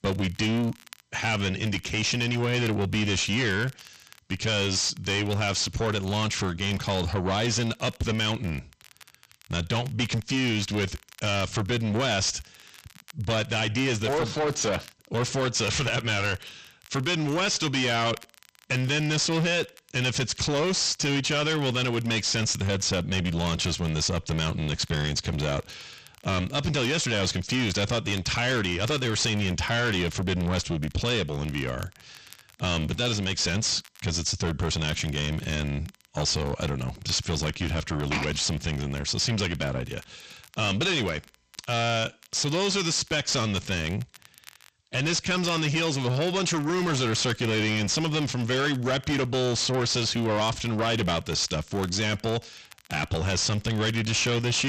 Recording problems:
distortion; heavy; 5 dB below the speech
garbled, watery; slightly; nothing above 8 kHz
crackle, like an old record; faint; 25 dB below the speech
abrupt cut into speech; at the end

